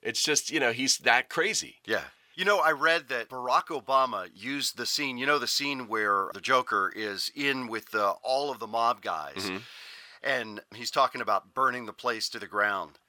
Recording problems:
thin; somewhat; fading below 1 kHz

